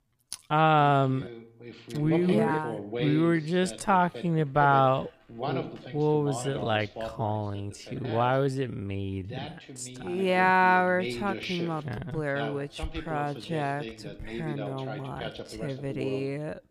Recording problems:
wrong speed, natural pitch; too slow; 0.5 times normal speed
voice in the background; noticeable; throughout; 10 dB below the speech

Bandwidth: 15 kHz